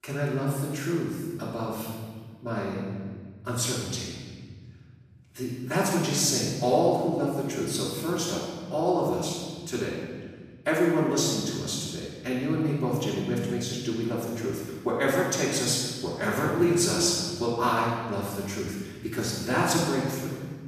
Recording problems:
room echo; strong; dies away in 1.7 s
off-mic speech; far

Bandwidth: 14.5 kHz